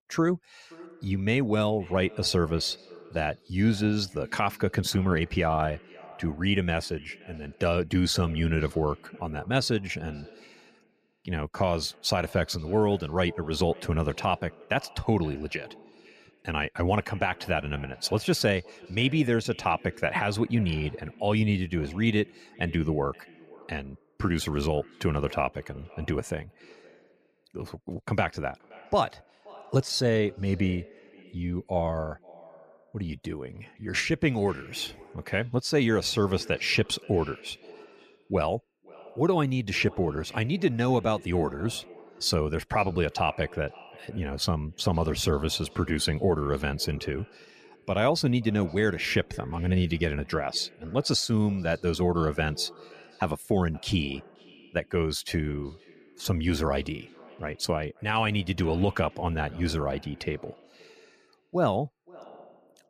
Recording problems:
echo of what is said; faint; throughout; 520 ms later, 25 dB below the speech

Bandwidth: 14.5 kHz